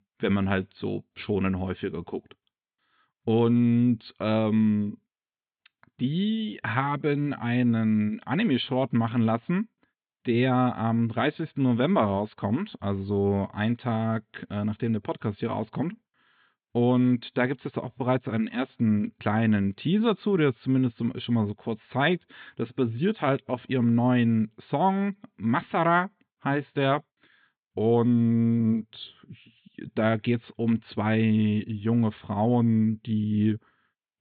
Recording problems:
high frequencies cut off; severe; nothing above 4 kHz

